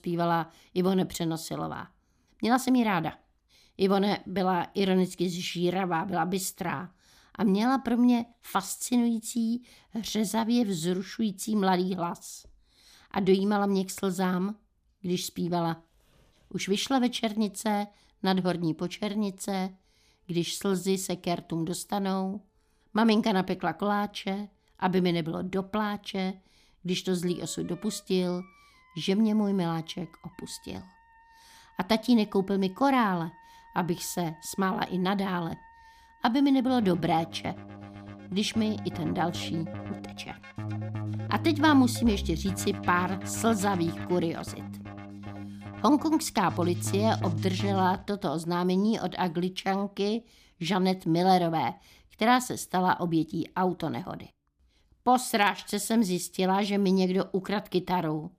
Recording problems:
background music; noticeable; throughout; 10 dB below the speech

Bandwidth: 15 kHz